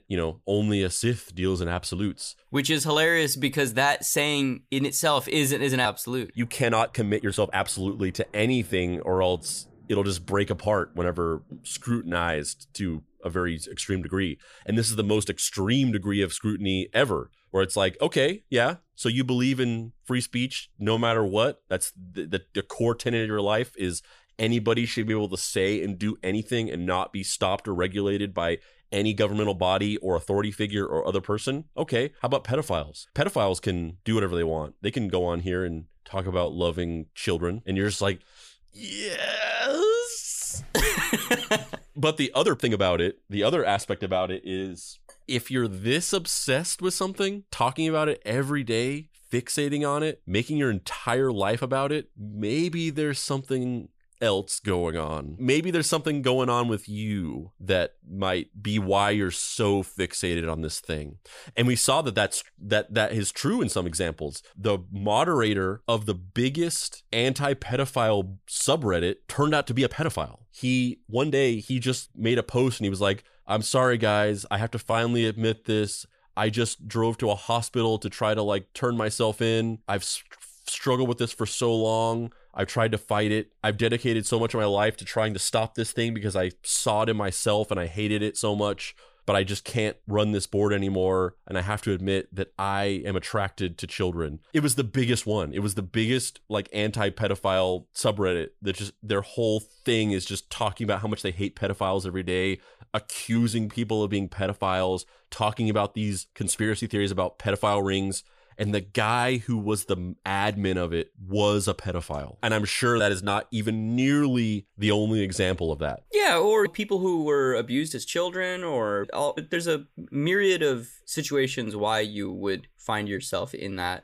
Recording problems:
uneven, jittery; strongly; from 6.5 s to 1:44

